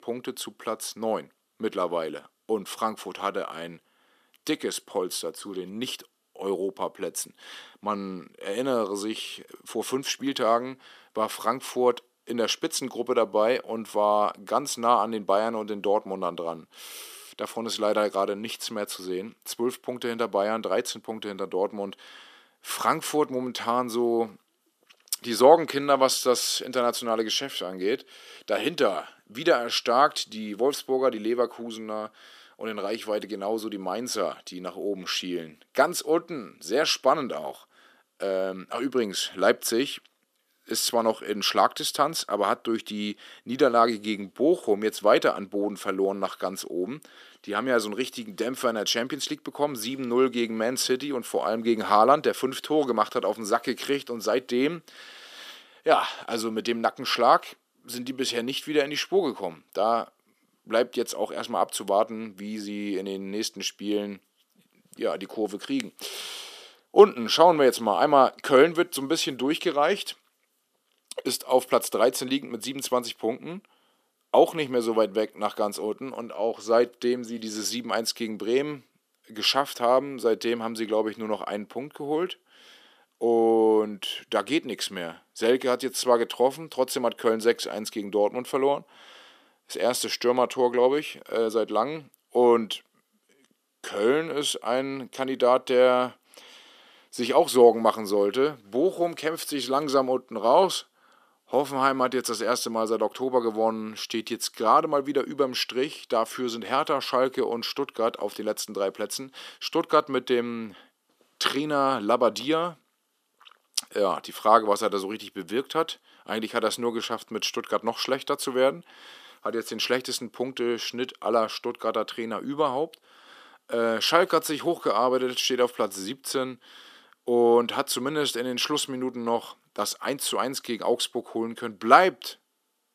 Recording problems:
thin; very slightly; fading below 250 Hz

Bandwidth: 14.5 kHz